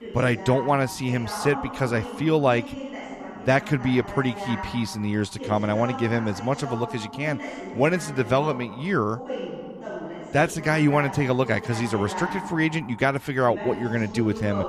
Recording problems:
voice in the background; noticeable; throughout; 10 dB below the speech

